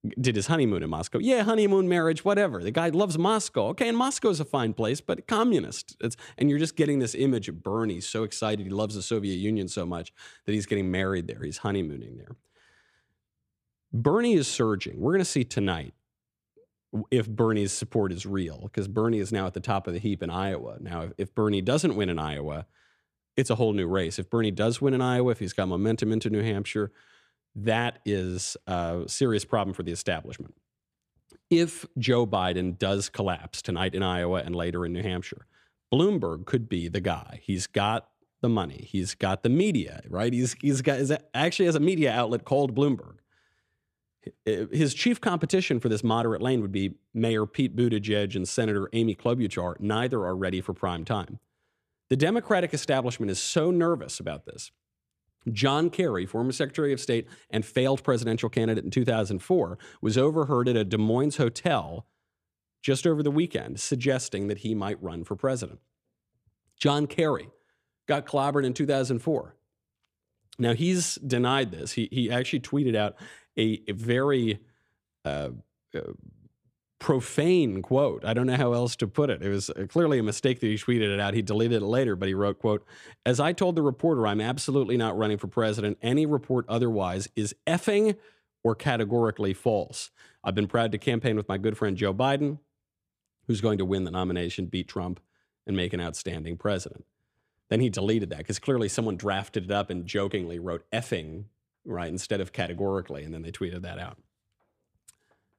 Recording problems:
none

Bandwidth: 14.5 kHz